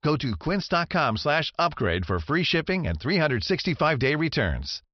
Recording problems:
high frequencies cut off; noticeable; nothing above 5.5 kHz

